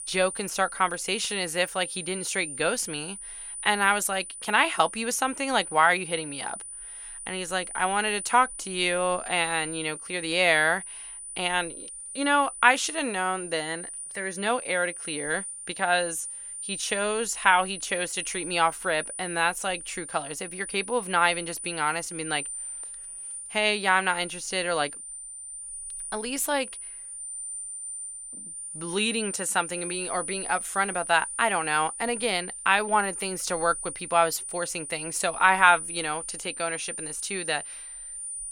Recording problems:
high-pitched whine; loud; throughout; 9.5 kHz, 9 dB below the speech

